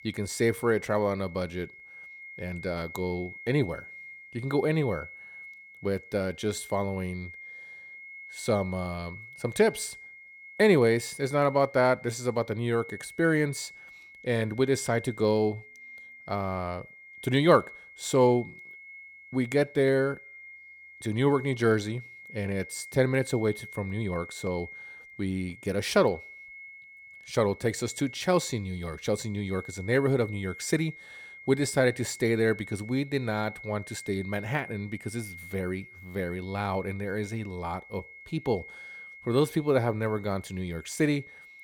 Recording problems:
high-pitched whine; noticeable; throughout; 2 kHz, 15 dB below the speech

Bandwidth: 17 kHz